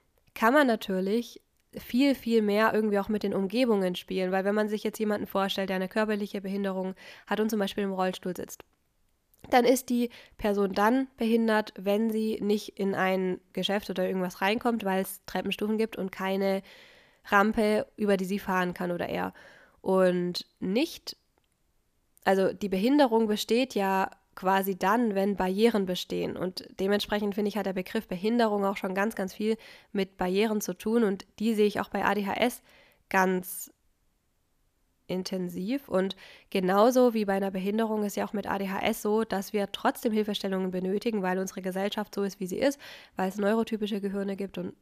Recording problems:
none

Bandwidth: 14.5 kHz